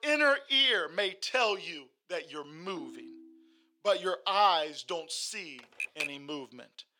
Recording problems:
thin; somewhat; fading below 550 Hz
phone ringing; faint; at 3 s; peak 15 dB below the speech
keyboard typing; noticeable; at 5.5 s; peak 5 dB below the speech

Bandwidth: 17 kHz